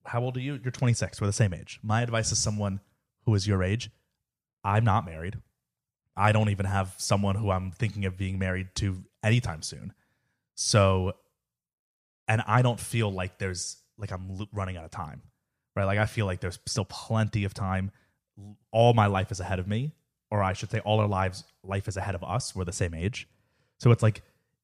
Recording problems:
none

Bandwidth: 14.5 kHz